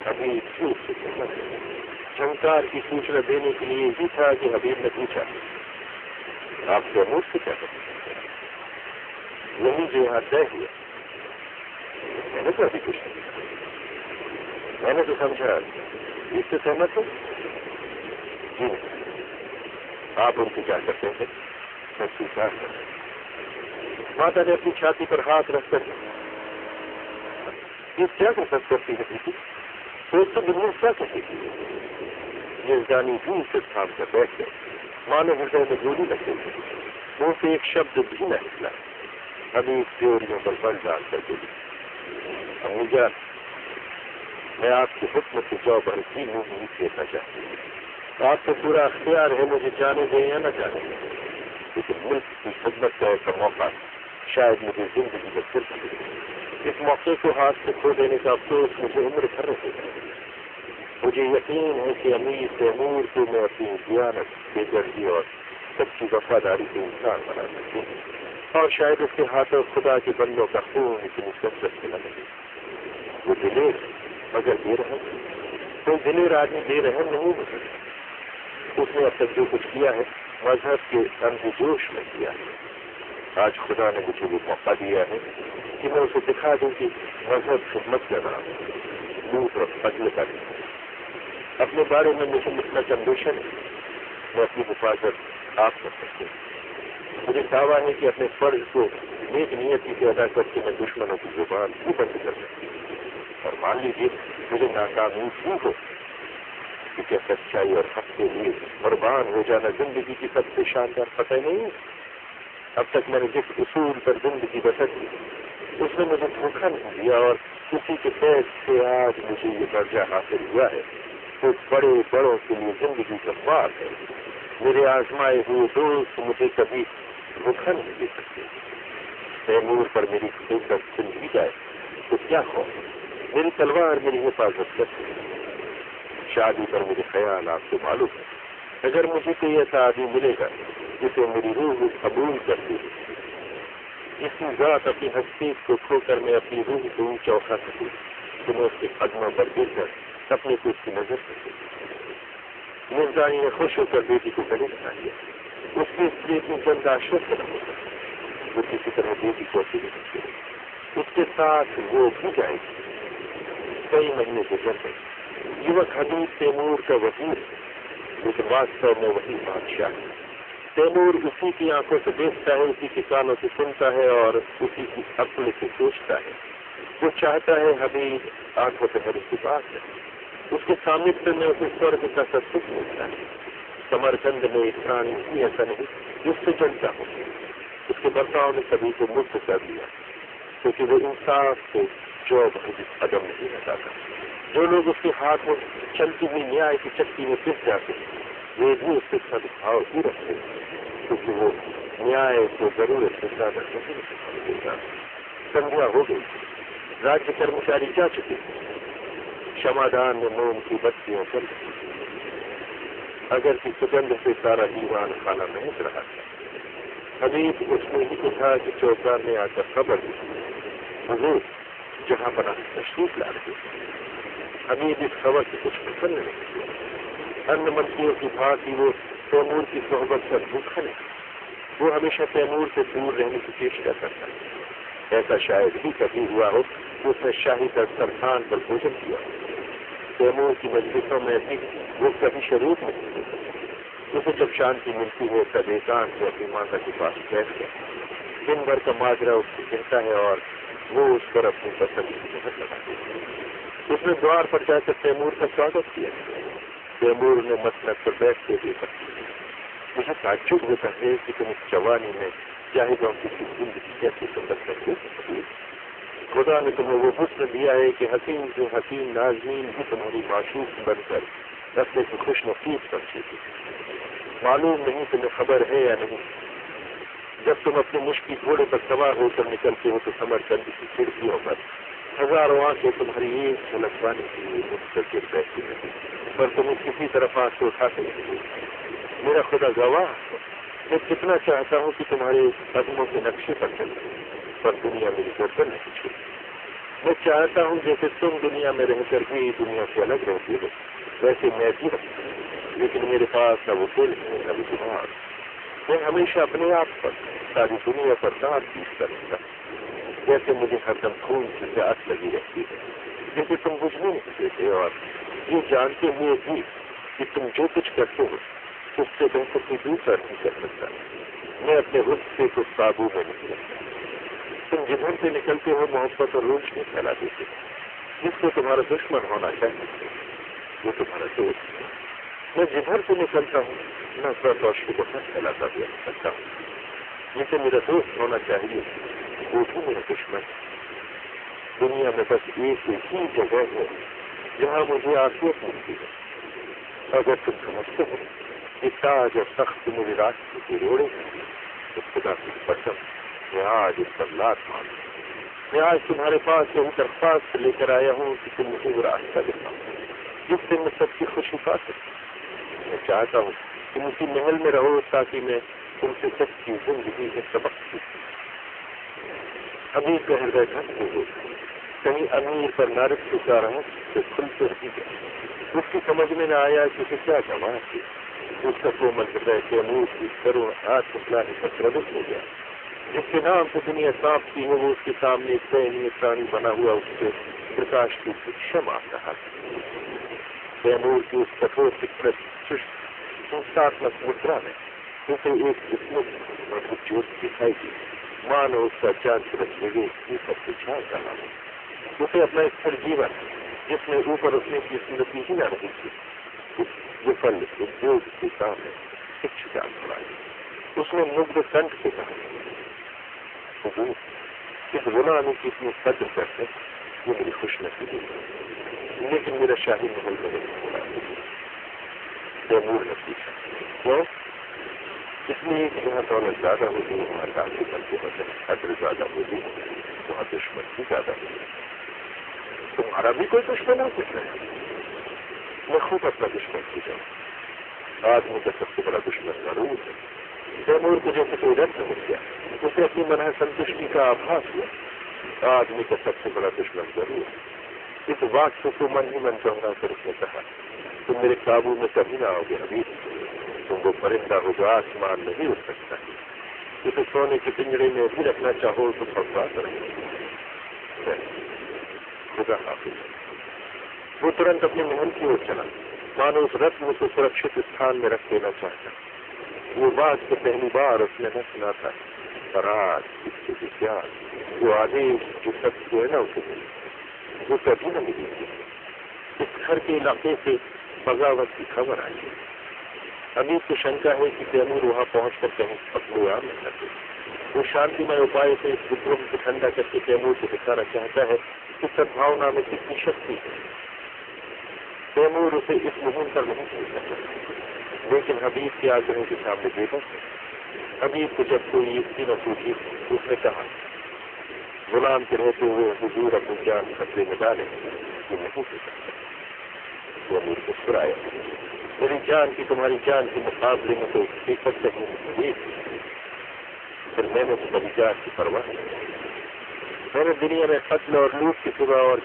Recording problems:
phone-call audio; poor line; nothing above 3 kHz
distortion; heavy; 14% of the sound clipped
wind noise on the microphone; occasional gusts; 15 dB below the speech
hiss; noticeable; throughout; 15 dB below the speech
audio freezing; at 26 s for 1.5 s

